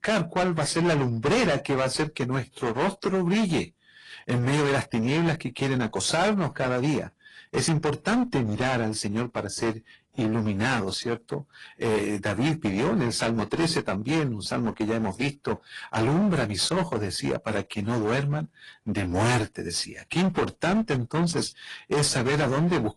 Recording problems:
distortion; heavy; 17% of the sound clipped
garbled, watery; slightly; nothing above 10 kHz

